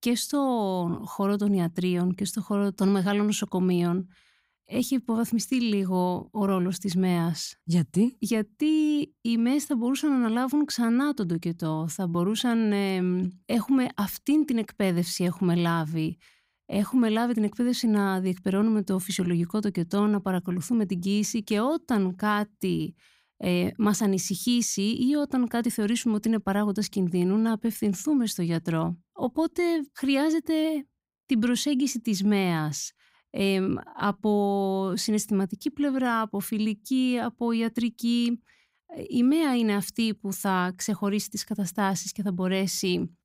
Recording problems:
none

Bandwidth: 15.5 kHz